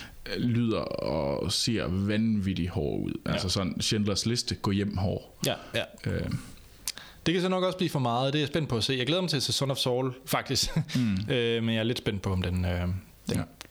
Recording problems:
squashed, flat; heavily

